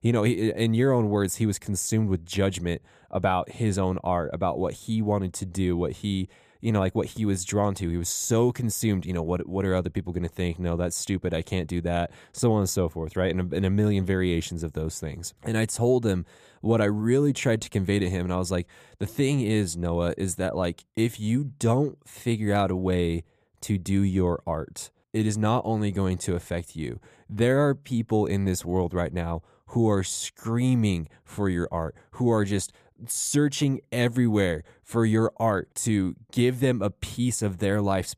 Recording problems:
none

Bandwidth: 14.5 kHz